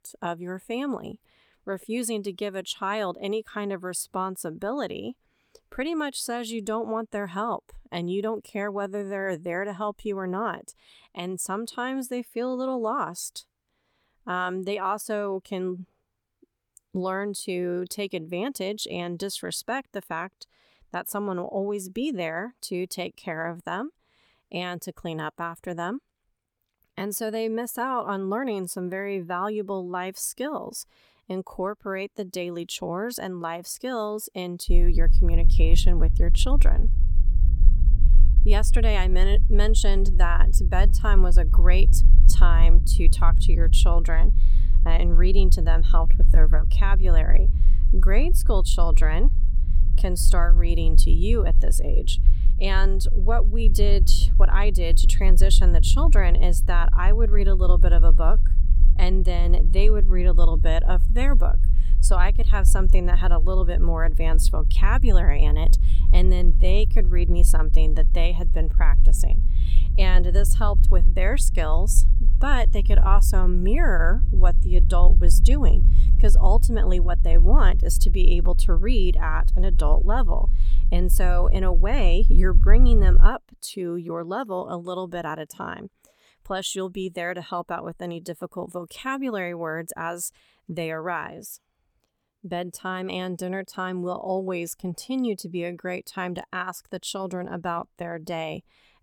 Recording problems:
low rumble; noticeable; from 35 s to 1:23; 15 dB below the speech

